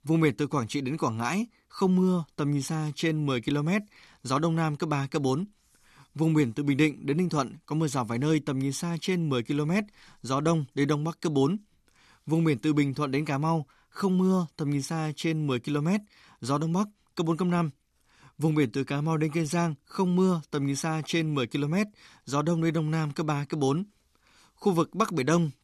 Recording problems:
none

